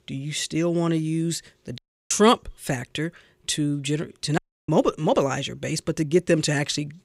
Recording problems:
audio cutting out; at 2 s and at 4.5 s

